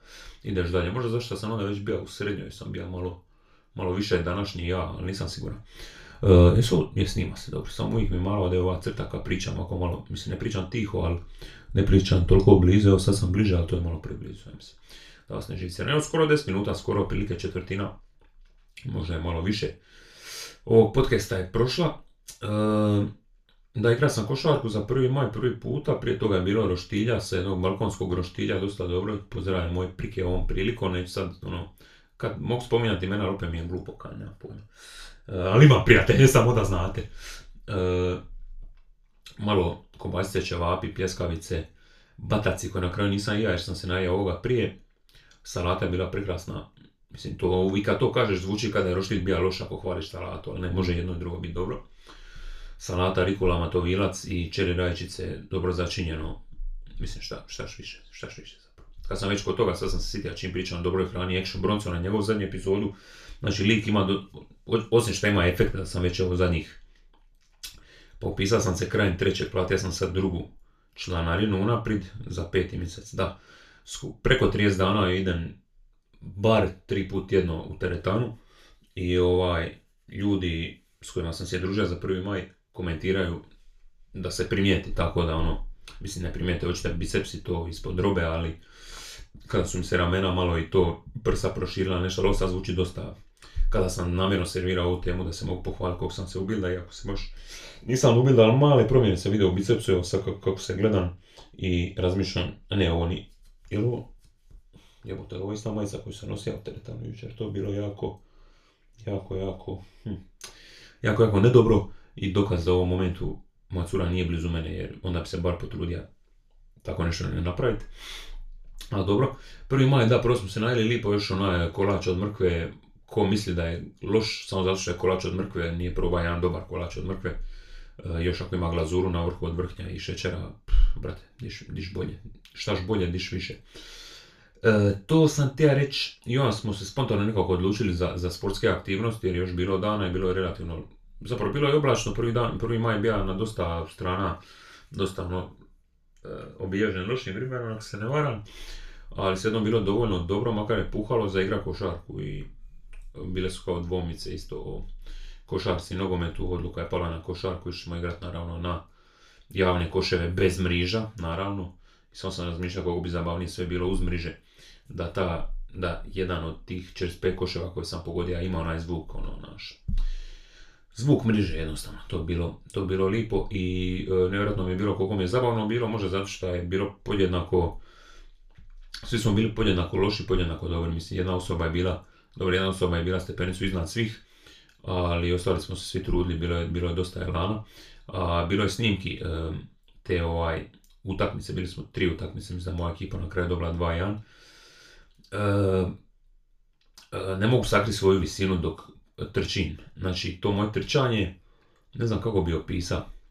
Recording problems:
off-mic speech; far
room echo; very slight; dies away in 0.3 s

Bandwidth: 14.5 kHz